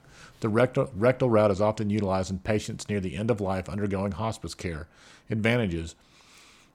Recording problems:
none

